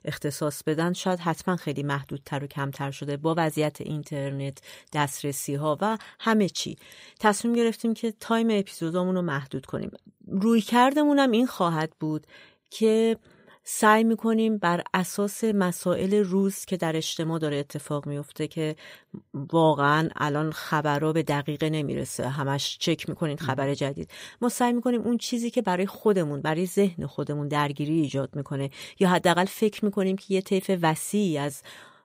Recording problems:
none

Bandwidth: 15.5 kHz